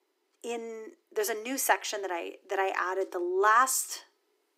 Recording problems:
thin; very; fading below 300 Hz

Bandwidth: 15.5 kHz